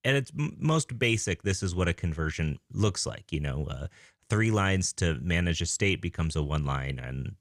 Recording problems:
none

